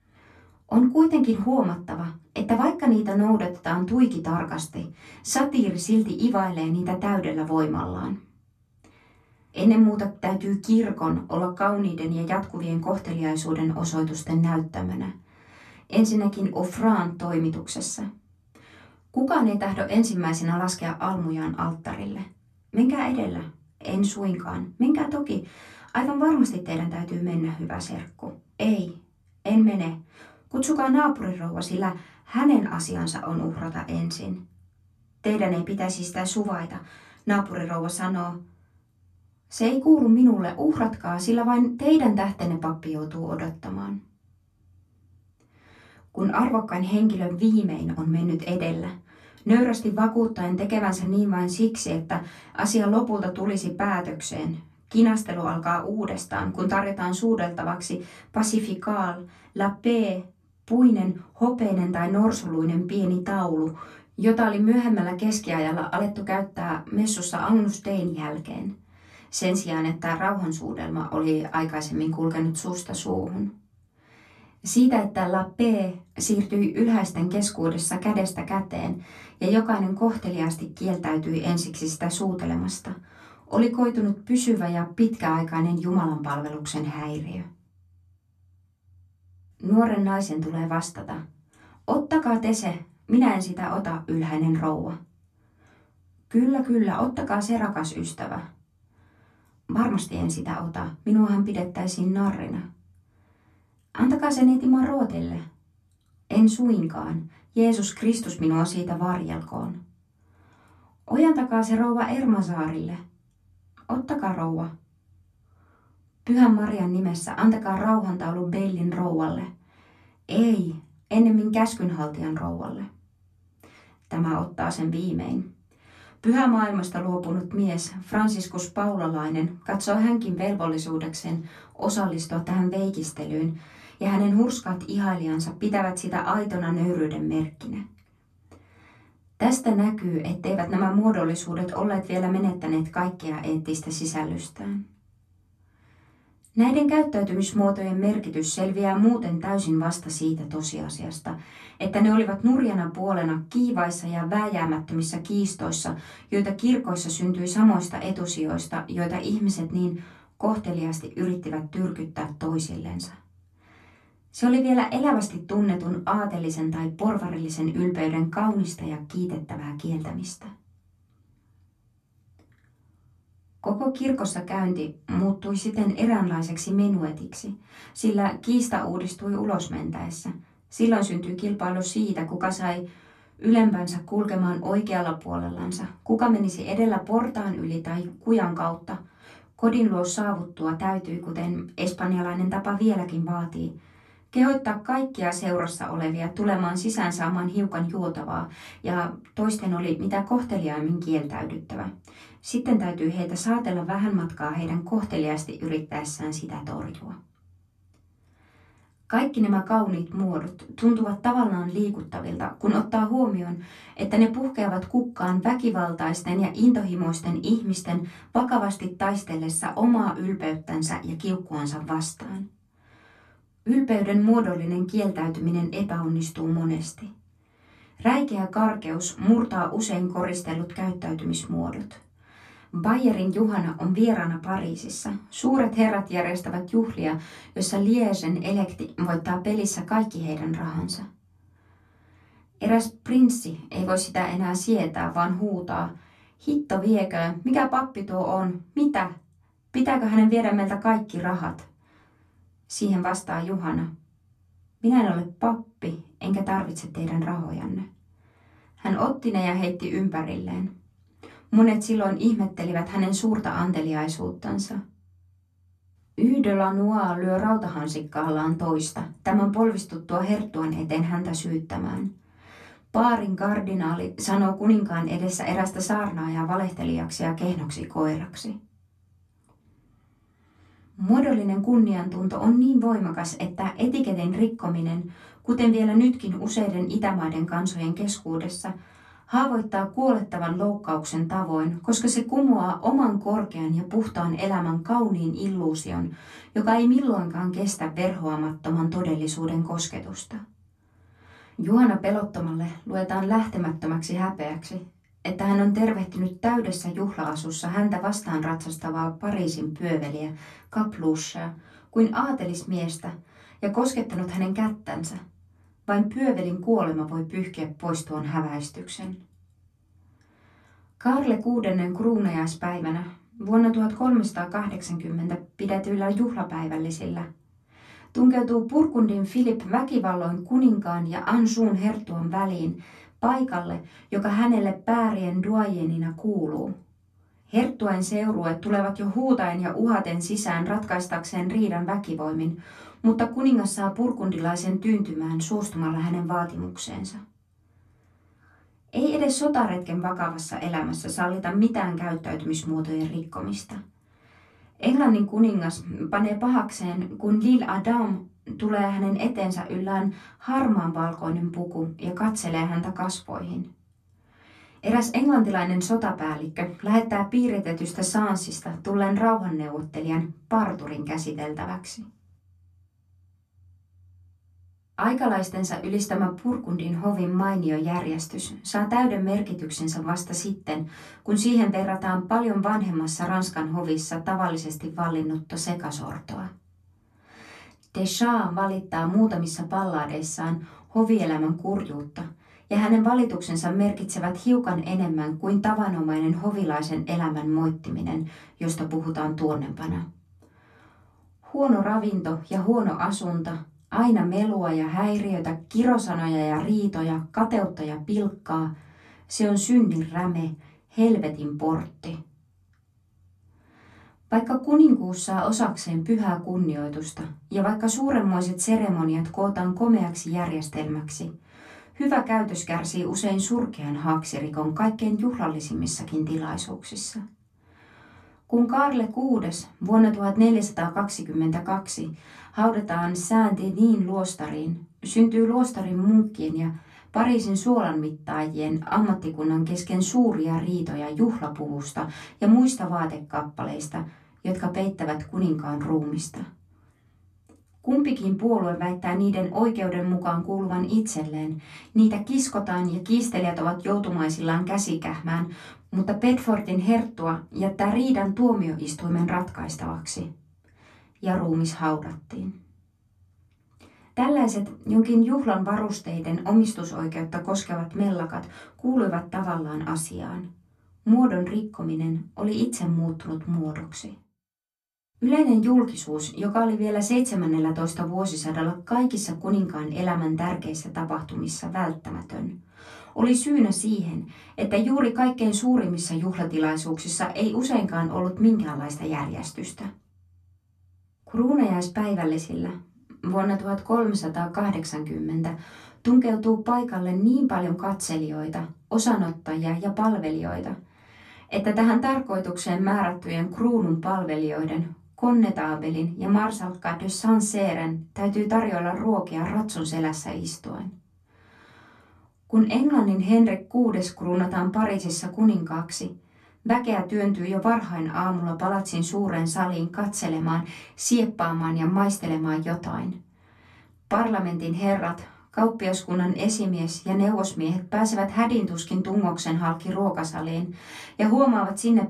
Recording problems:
off-mic speech; far
room echo; very slight; dies away in 0.2 s

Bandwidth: 13.5 kHz